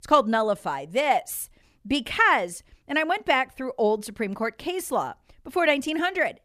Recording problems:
none

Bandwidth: 14.5 kHz